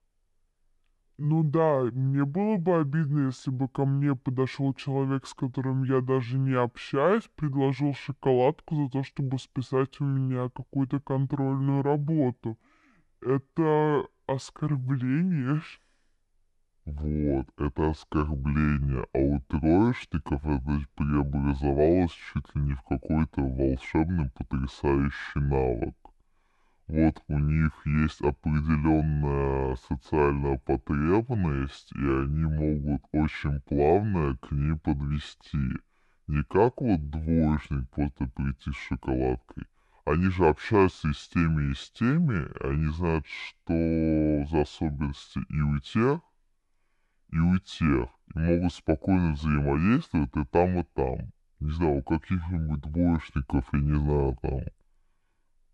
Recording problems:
wrong speed and pitch; too slow and too low; 0.6 times normal speed

